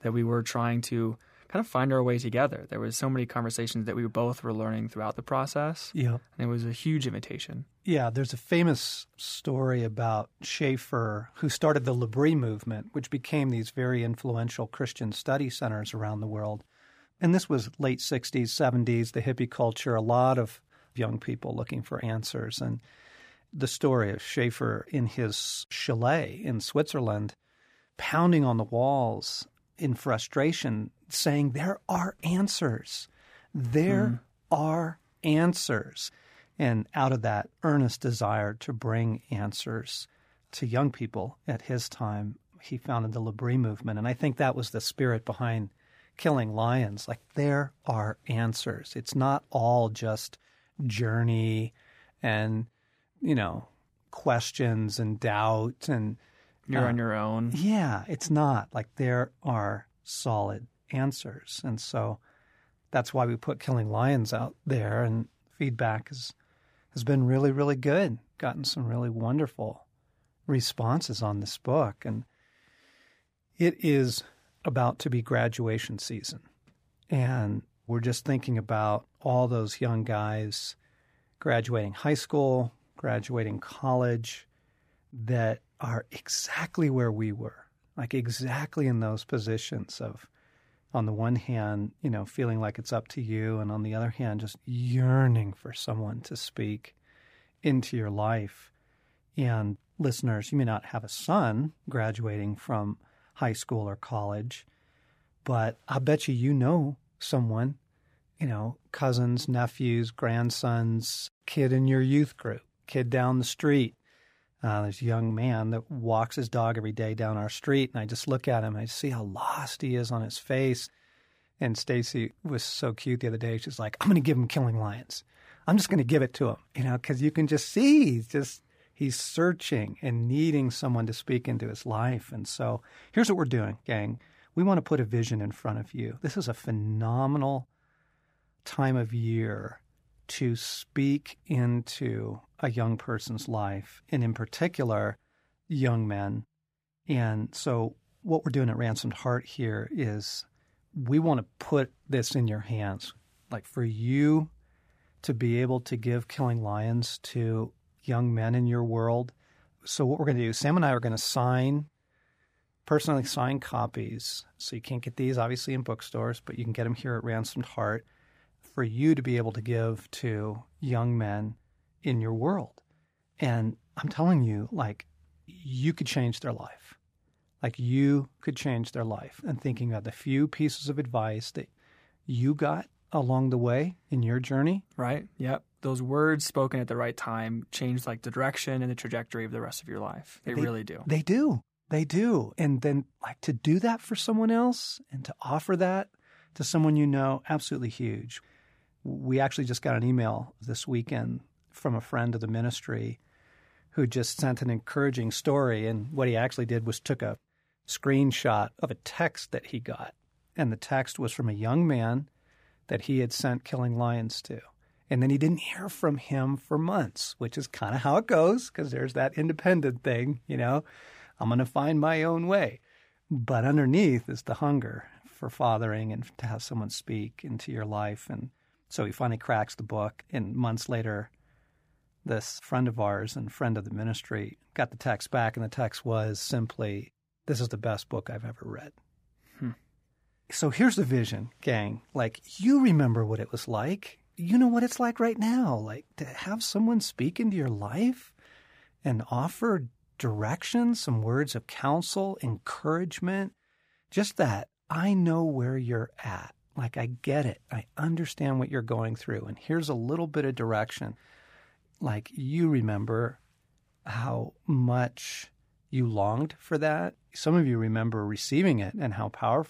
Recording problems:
none

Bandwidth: 15 kHz